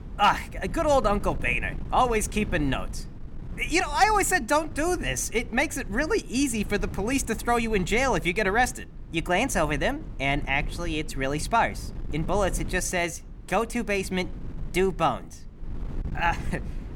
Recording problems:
wind noise on the microphone; occasional gusts; 25 dB below the speech

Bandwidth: 17.5 kHz